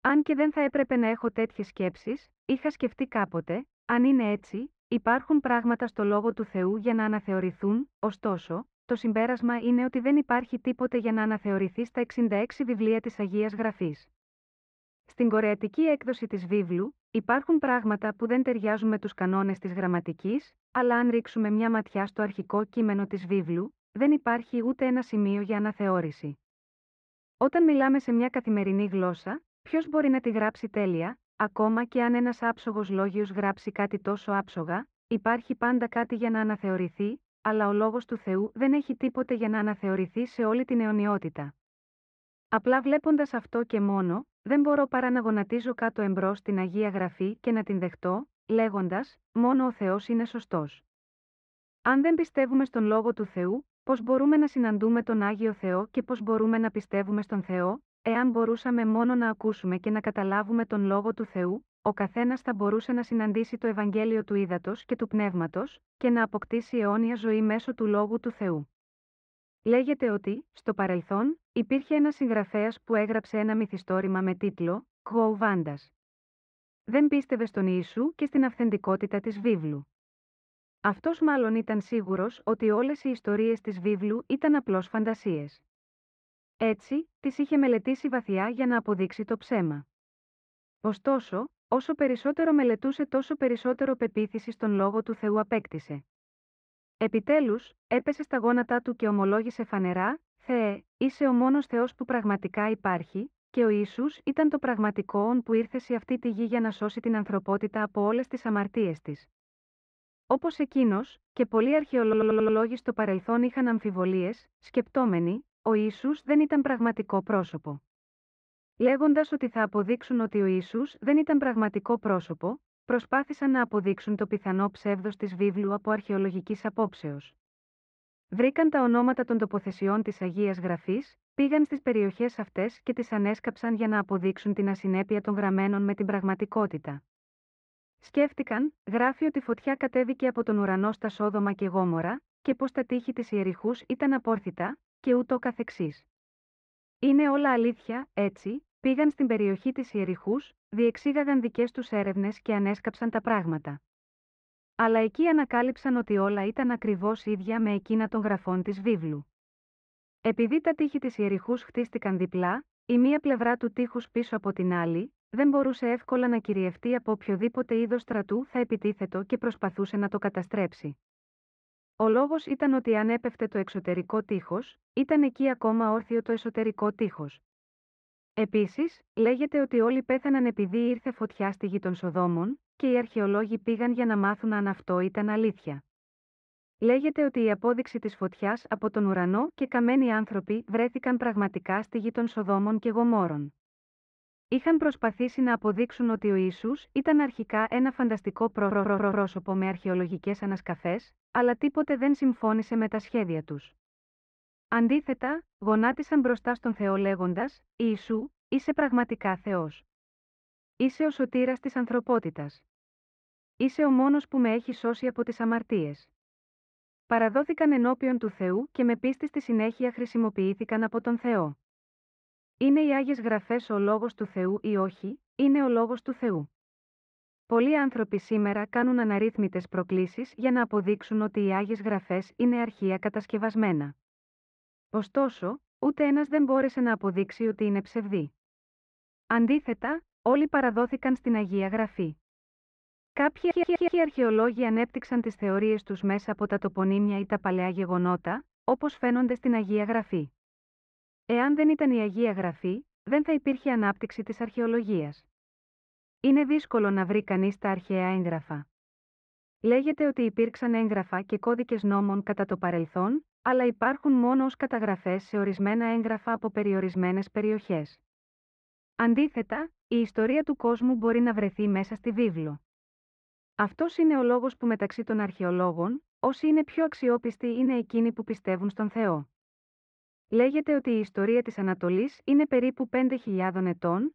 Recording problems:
muffled; very; fading above 2 kHz
audio stuttering; at 1:52, at 3:19 and at 4:03

